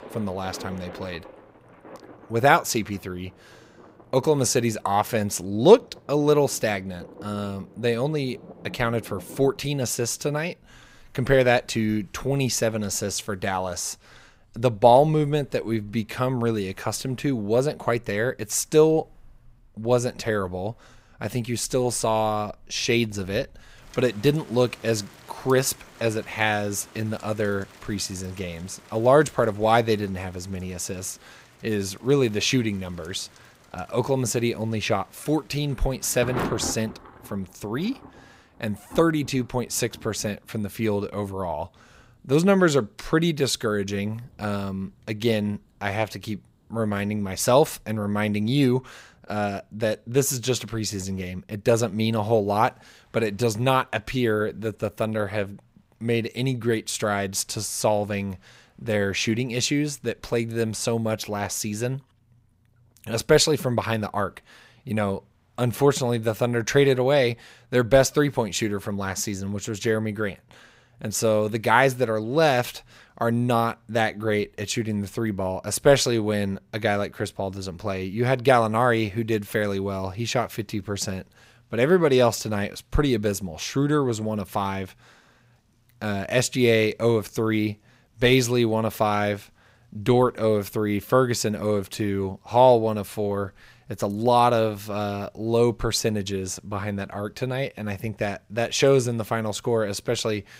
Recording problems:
rain or running water; faint; throughout; 20 dB below the speech

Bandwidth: 15.5 kHz